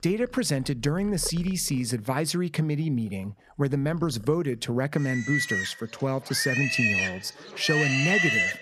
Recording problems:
animal sounds; very faint; throughout; 2 dB above the speech

